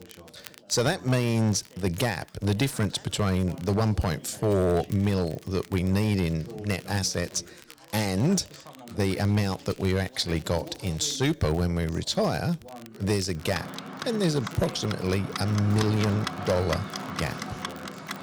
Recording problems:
distortion; slight; 3% of the sound clipped
household noises; loud; throughout; 9 dB below the speech
background chatter; faint; throughout; 3 voices, 20 dB below the speech
crackle, like an old record; faint; 25 dB below the speech

